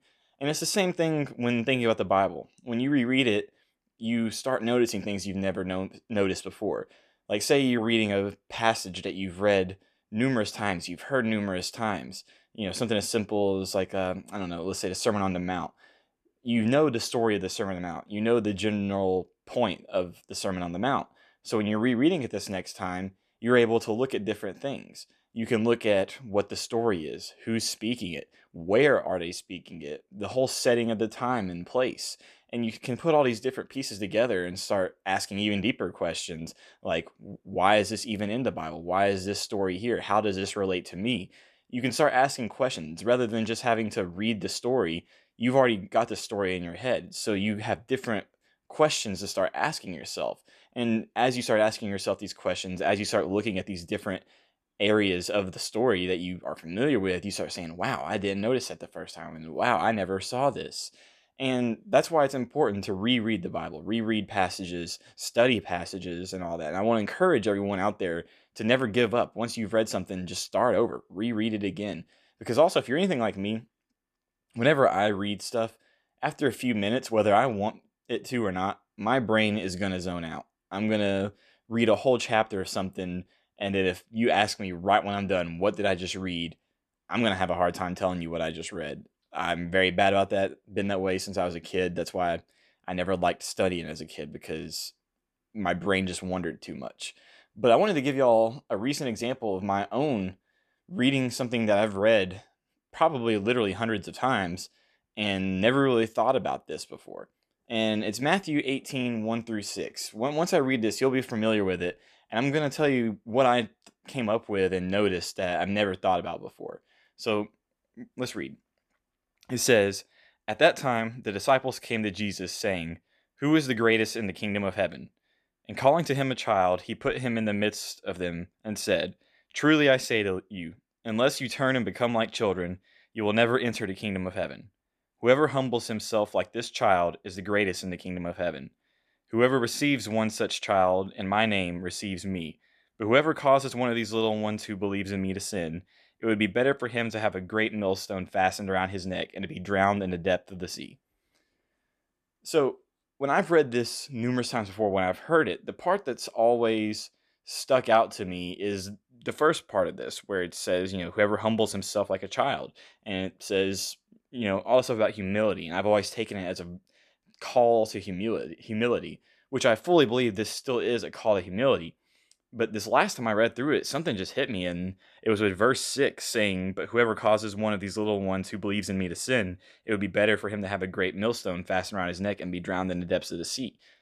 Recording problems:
none

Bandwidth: 14 kHz